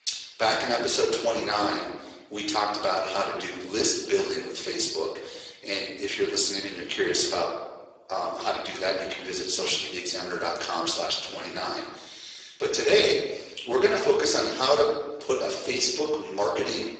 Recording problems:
off-mic speech; far
garbled, watery; badly; nothing above 7.5 kHz
thin; very; fading below 350 Hz
room echo; noticeable; dies away in 0.9 s

